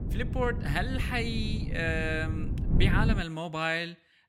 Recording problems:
wind noise on the microphone; occasional gusts; until 3 s; 10 dB below the speech

